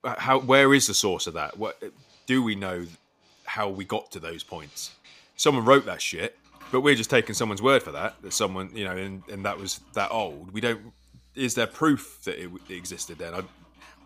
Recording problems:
household noises; faint; throughout; 30 dB below the speech

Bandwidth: 15 kHz